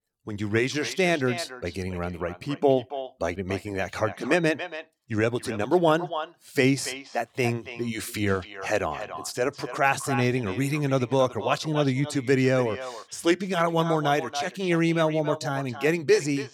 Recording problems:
echo of what is said; strong; throughout; 280 ms later, 10 dB below the speech

